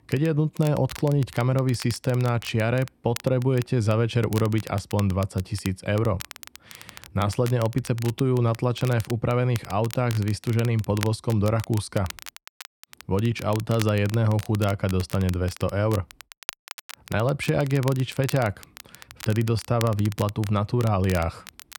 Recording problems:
crackle, like an old record; noticeable; 15 dB below the speech

